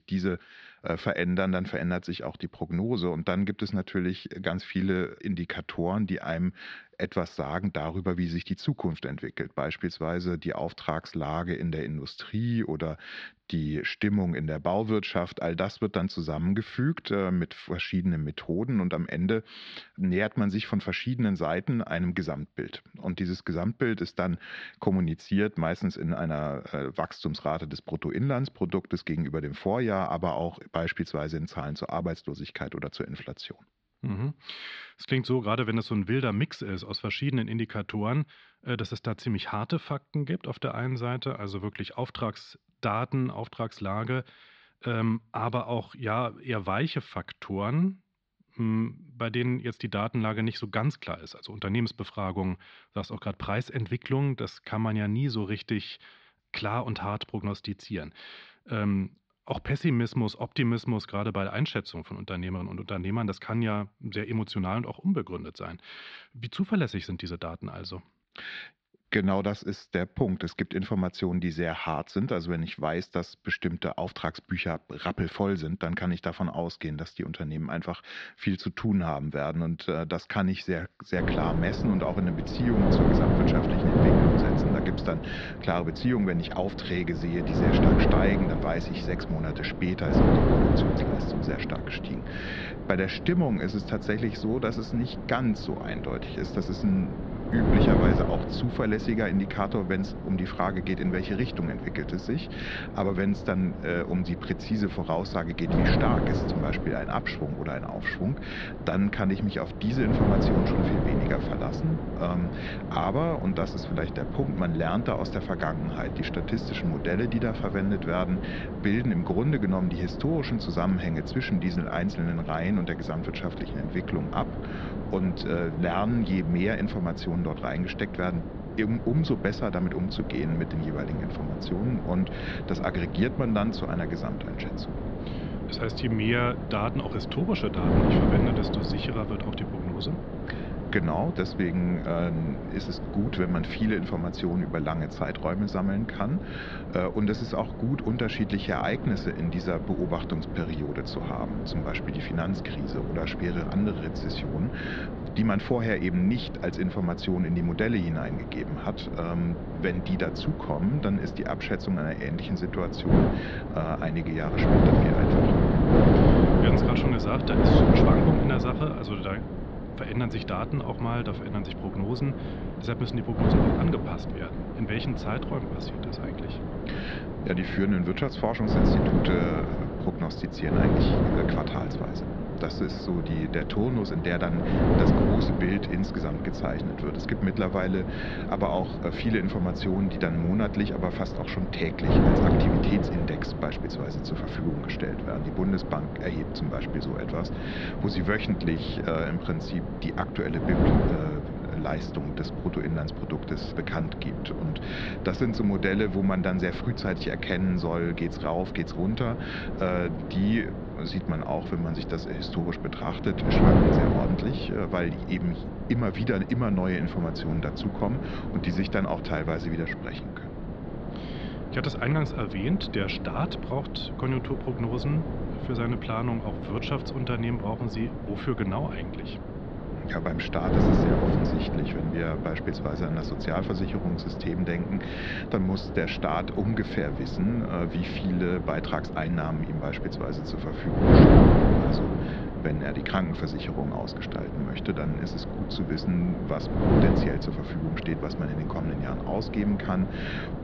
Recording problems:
muffled; slightly; fading above 4.5 kHz
wind noise on the microphone; heavy; from 1:21 on; 1 dB below the speech

